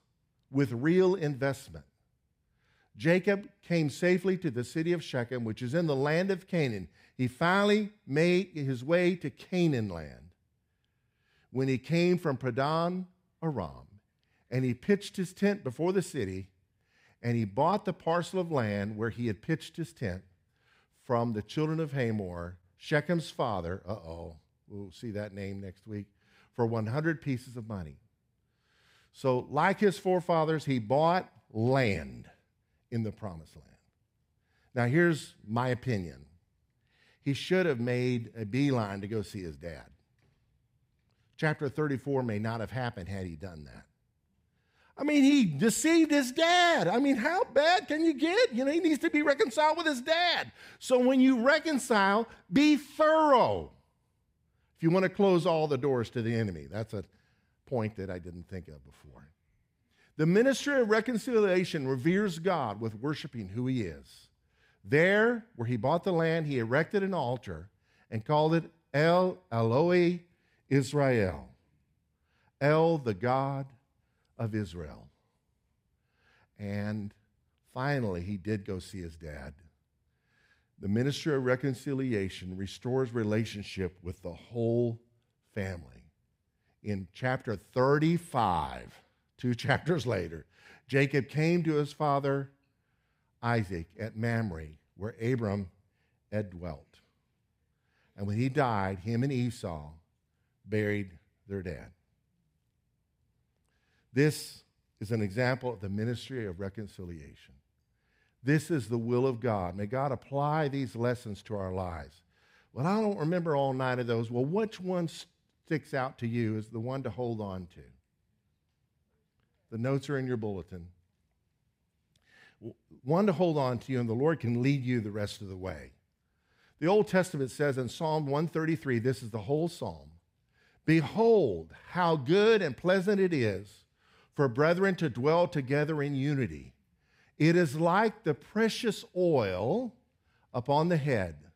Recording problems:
none

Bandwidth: 15.5 kHz